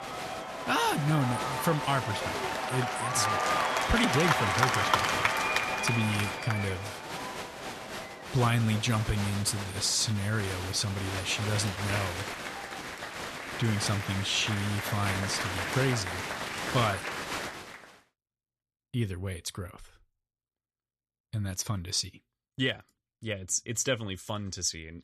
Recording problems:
crowd noise; loud; until 18 s; 1 dB below the speech

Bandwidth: 13.5 kHz